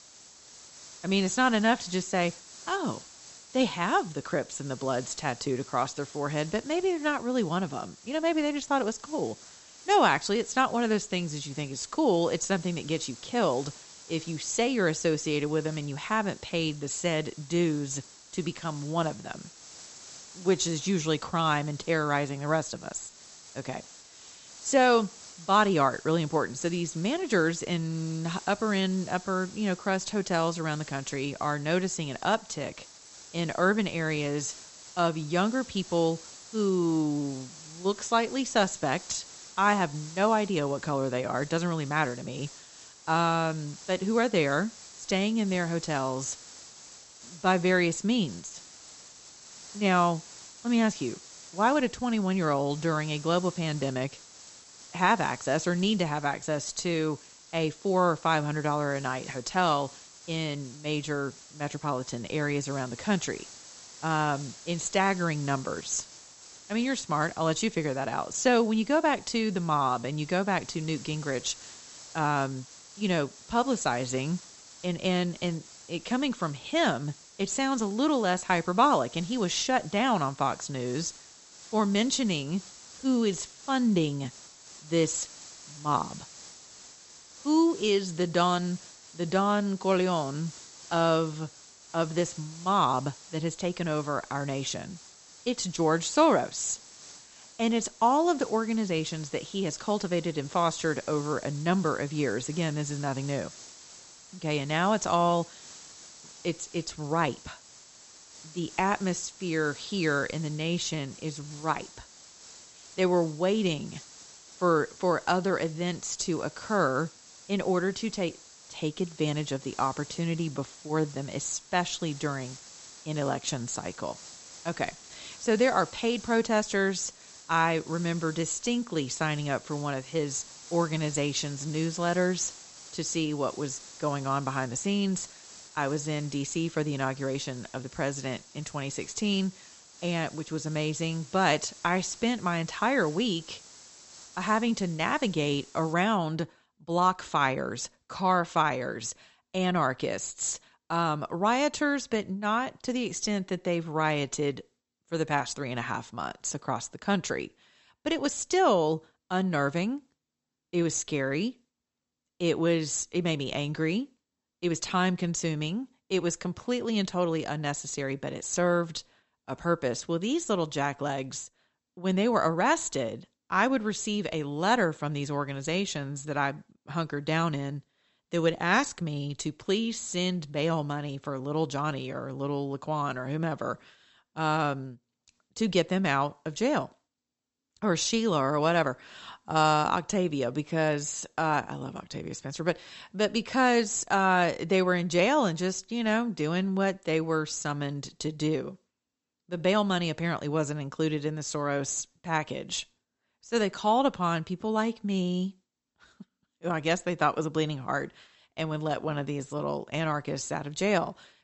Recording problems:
high frequencies cut off; noticeable; nothing above 8 kHz
hiss; noticeable; until 2:26; 20 dB below the speech

